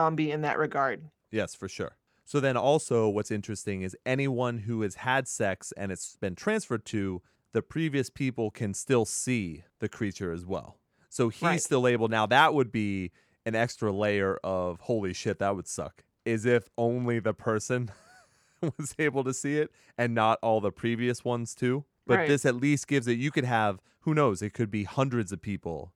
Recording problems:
abrupt cut into speech; at the start

